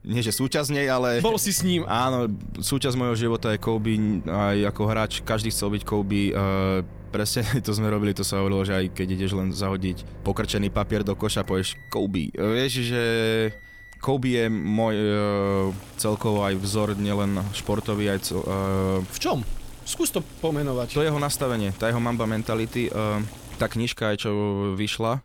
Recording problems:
household noises; noticeable; throughout; 15 dB below the speech

